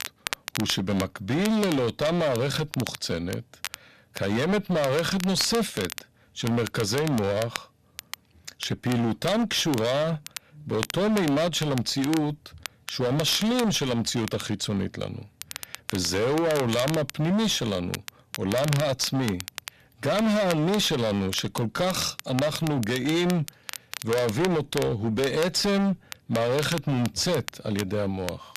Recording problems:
distortion; heavy; 18% of the sound clipped
crackle, like an old record; noticeable; 10 dB below the speech

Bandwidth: 14 kHz